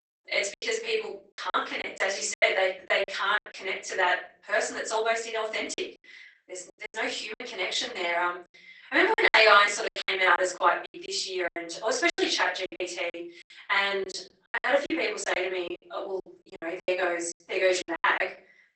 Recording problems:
off-mic speech; far
garbled, watery; badly; nothing above 8 kHz
thin; very; fading below 400 Hz
room echo; slight; dies away in 0.5 s
choppy; very; 14% of the speech affected

